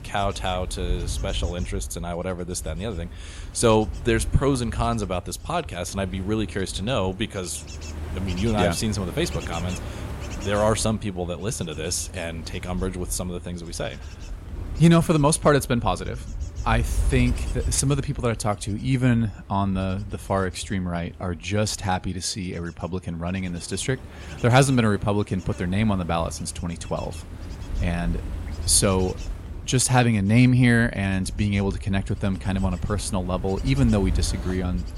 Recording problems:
wind noise on the microphone; occasional gusts; 15 dB below the speech

